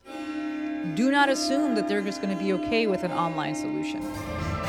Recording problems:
background music; loud; throughout; 5 dB below the speech

